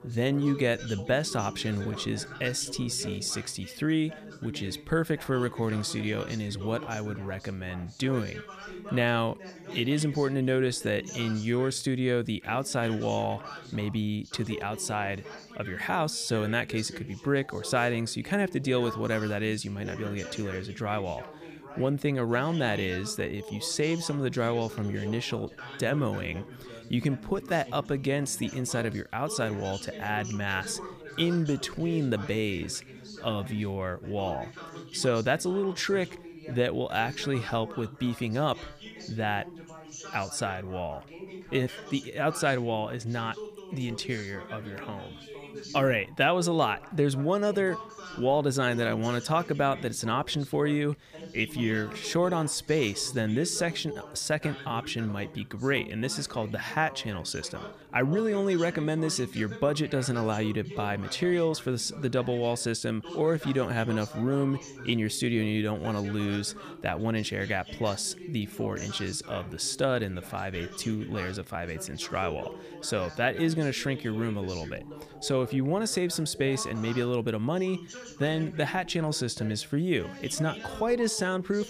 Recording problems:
background chatter; noticeable; throughout; 2 voices, 15 dB below the speech

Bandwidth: 15 kHz